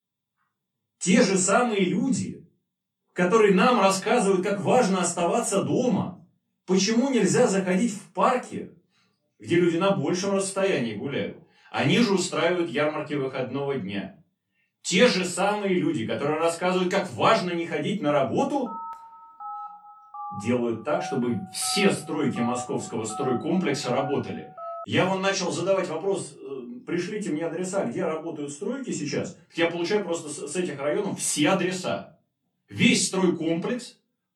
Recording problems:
off-mic speech; far
room echo; very slight; dies away in 0.3 s
phone ringing; faint; from 19 to 25 s; peak 10 dB below the speech

